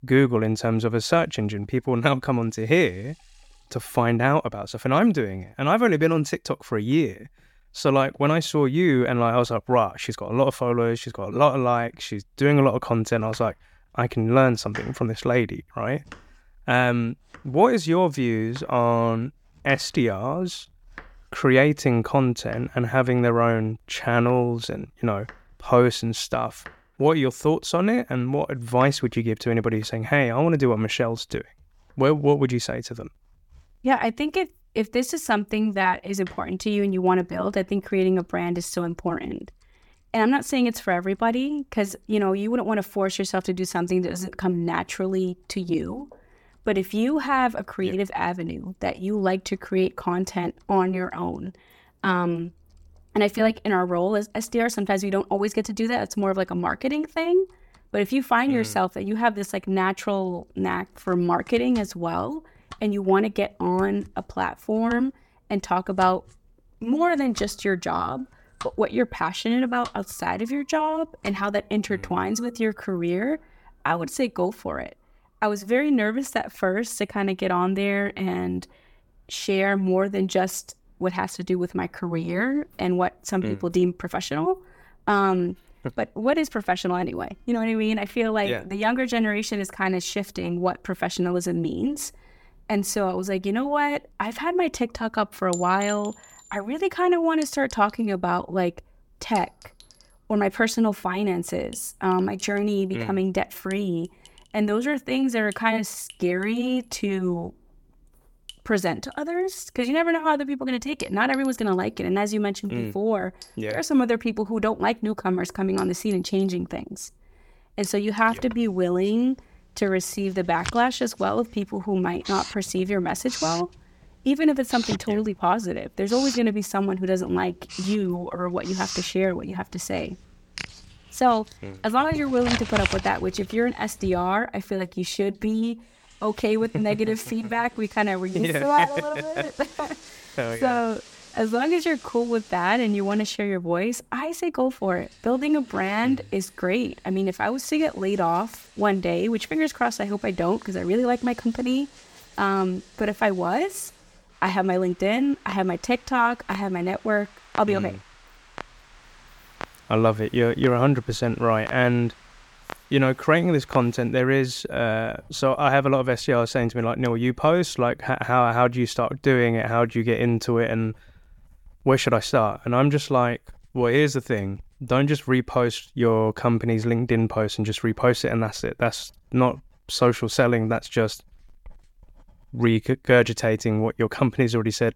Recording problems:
household noises; noticeable; throughout; 15 dB below the speech

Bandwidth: 17 kHz